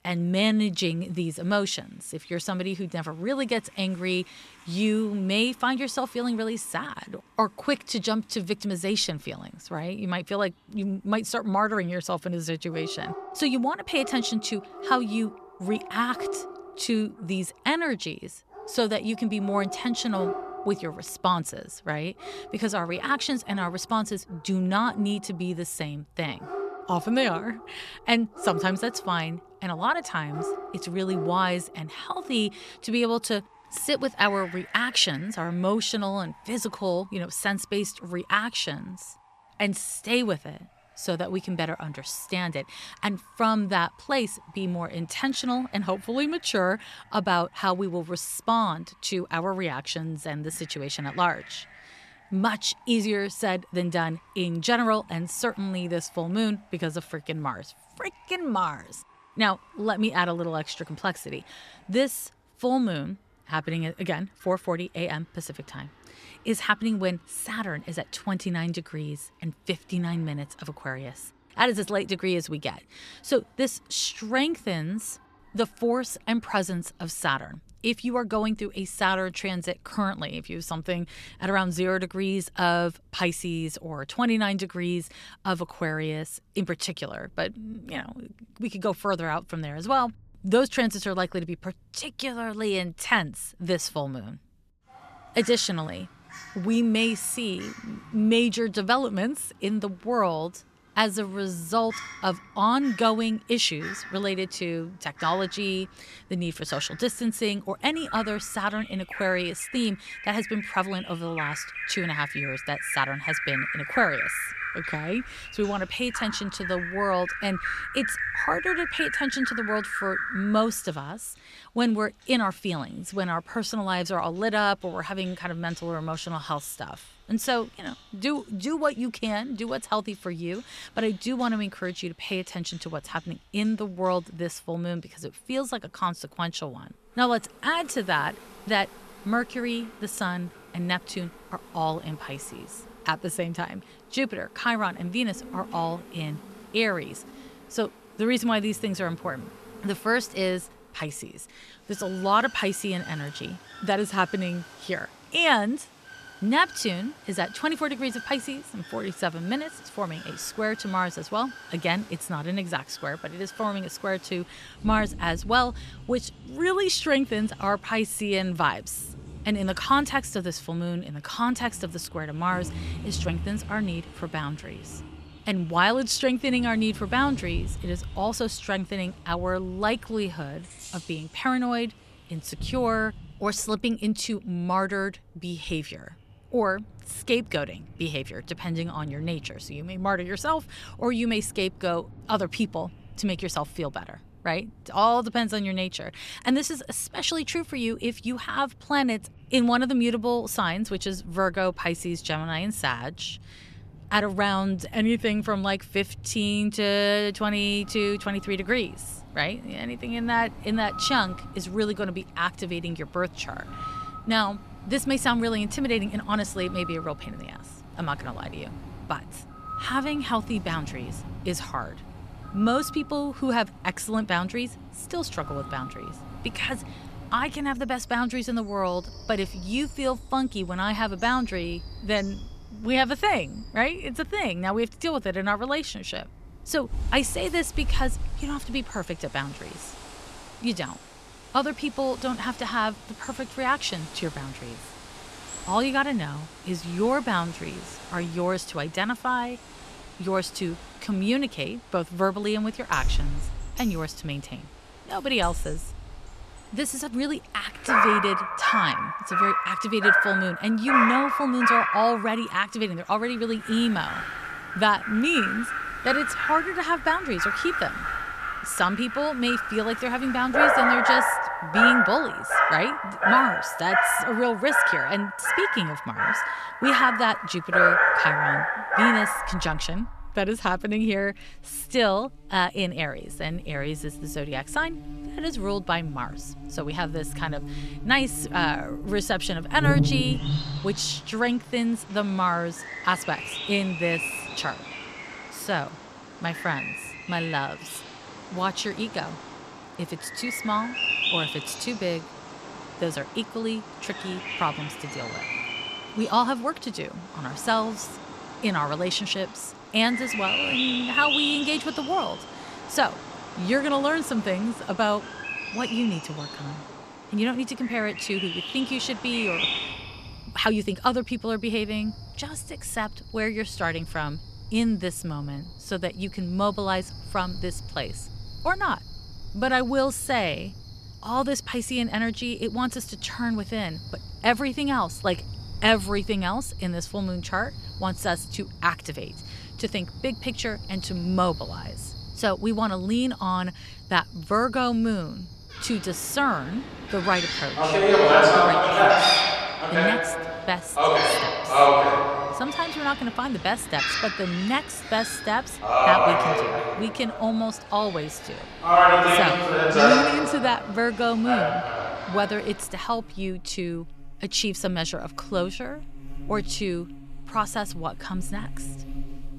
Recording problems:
animal sounds; very loud; throughout; 1 dB above the speech

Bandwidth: 14 kHz